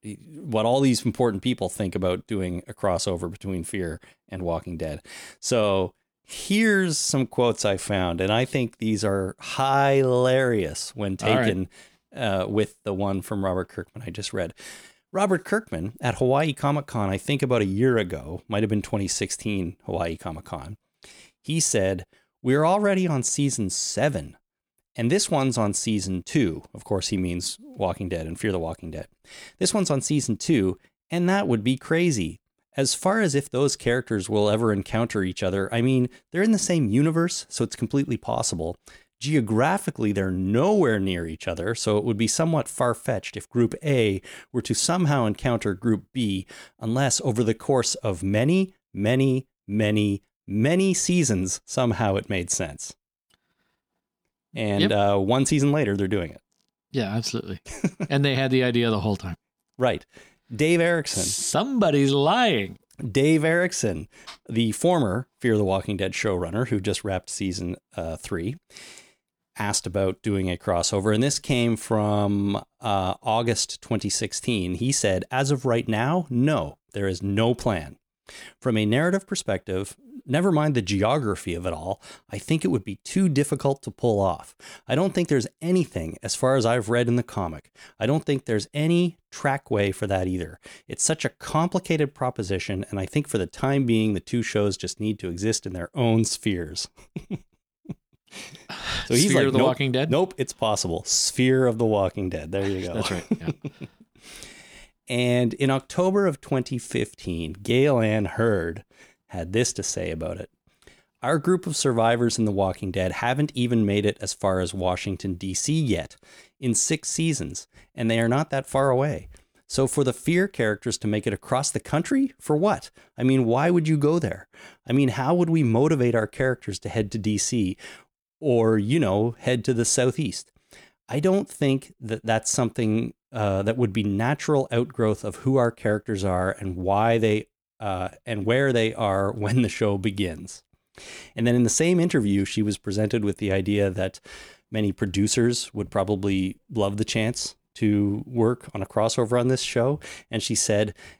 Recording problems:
none

